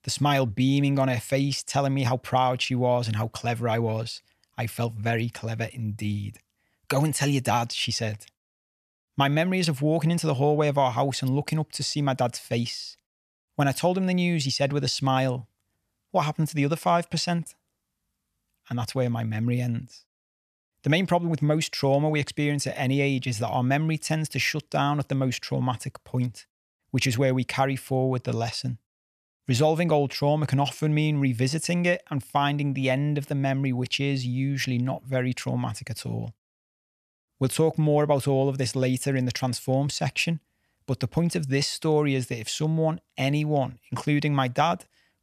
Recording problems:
none

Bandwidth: 14 kHz